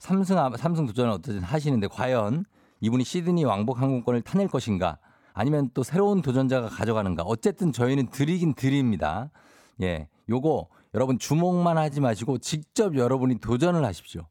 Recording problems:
uneven, jittery; strongly; from 1 to 14 s

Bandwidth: 18 kHz